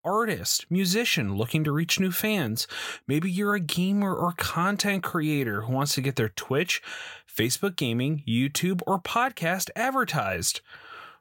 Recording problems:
none

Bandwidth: 16.5 kHz